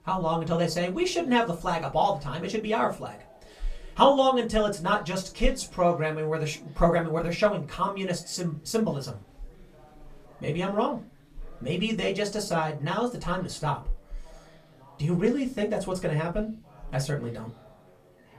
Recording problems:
off-mic speech; far
room echo; very slight; dies away in 0.2 s
chatter from many people; faint; throughout; 25 dB below the speech

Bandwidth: 14.5 kHz